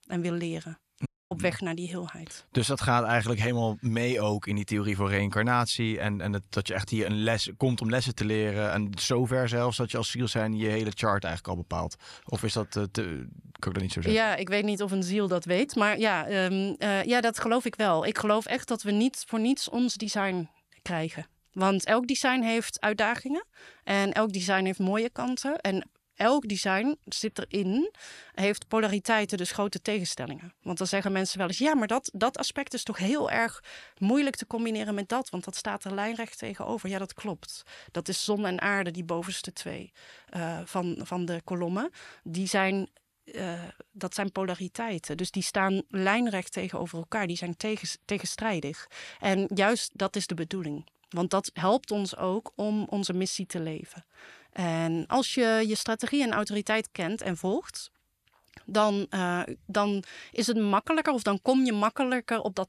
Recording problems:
audio cutting out; at 1 s

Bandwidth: 14.5 kHz